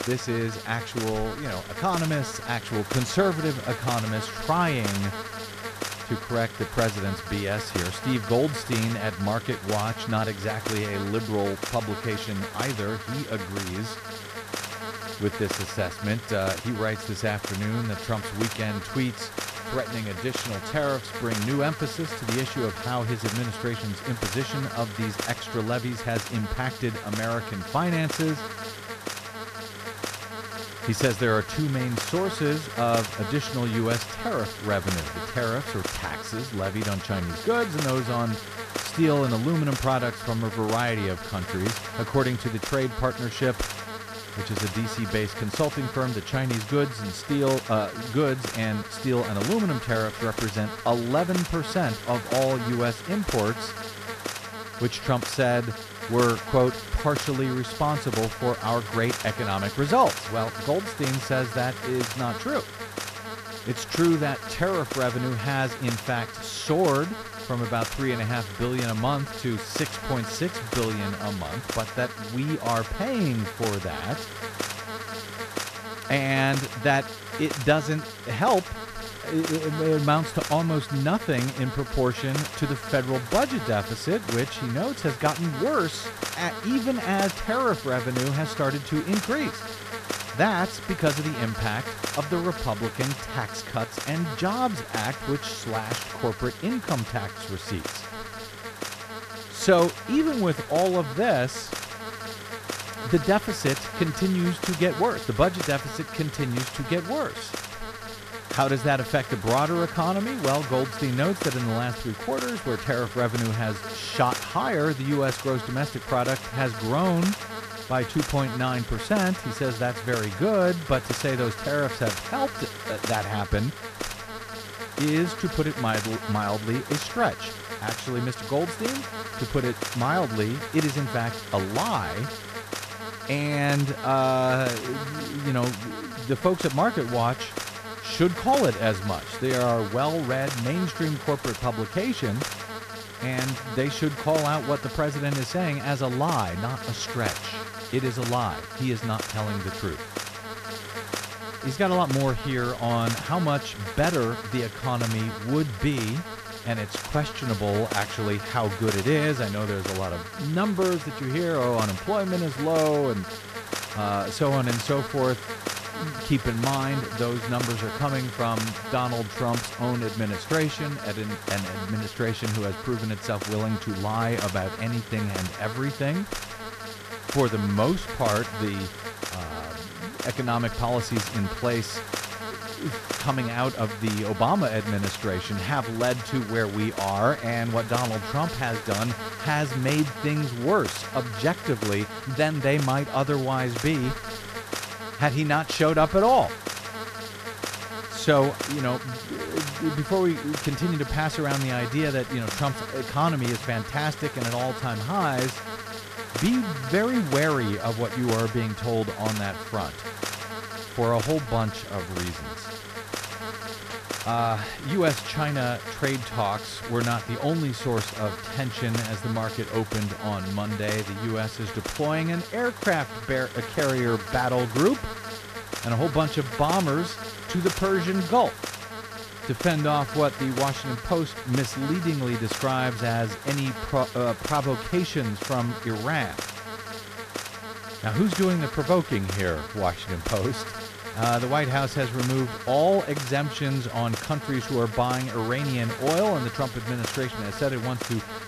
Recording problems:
electrical hum; loud; throughout; 50 Hz, 5 dB below the speech

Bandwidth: 14.5 kHz